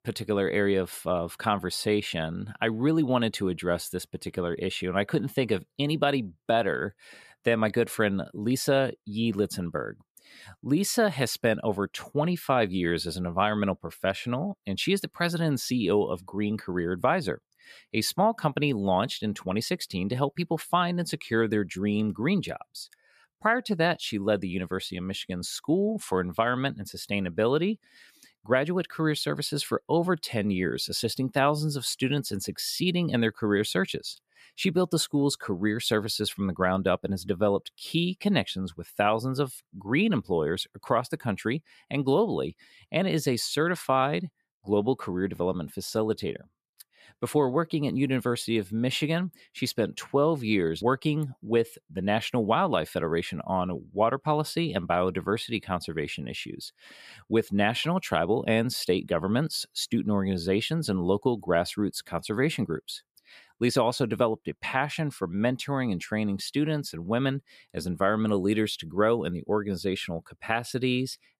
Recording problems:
none

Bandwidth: 14.5 kHz